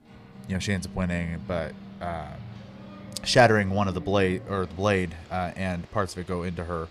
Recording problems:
household noises; noticeable; throughout; 15 dB below the speech

